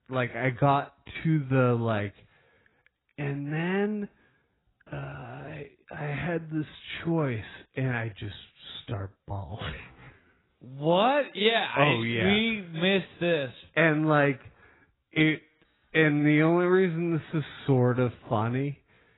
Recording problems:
garbled, watery; badly; nothing above 4 kHz
wrong speed, natural pitch; too slow; 0.7 times normal speed

